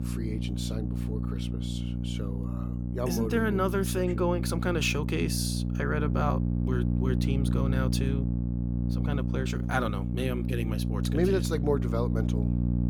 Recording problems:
electrical hum; loud; throughout; 60 Hz, 7 dB below the speech

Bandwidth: 18 kHz